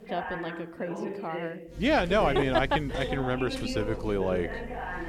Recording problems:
voice in the background; loud; throughout; 8 dB below the speech
electrical hum; faint; from 2 s on; 50 Hz, 20 dB below the speech

